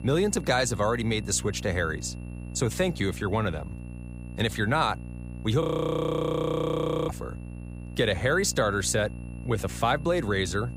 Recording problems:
electrical hum; faint; throughout; 60 Hz, 20 dB below the speech
high-pitched whine; faint; throughout; 2.5 kHz, 30 dB below the speech
audio freezing; at 5.5 s for 1.5 s

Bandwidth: 15.5 kHz